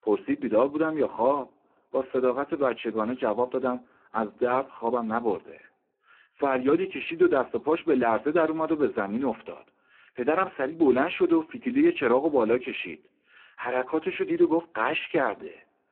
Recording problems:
phone-call audio; poor line

